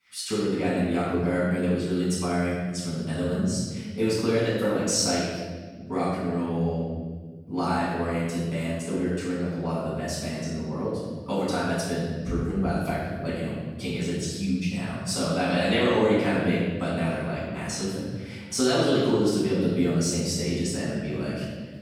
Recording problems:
room echo; strong; dies away in 1.5 s
off-mic speech; far

